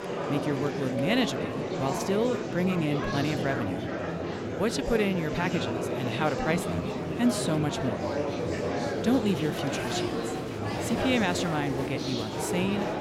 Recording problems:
murmuring crowd; loud; throughout; 1 dB below the speech

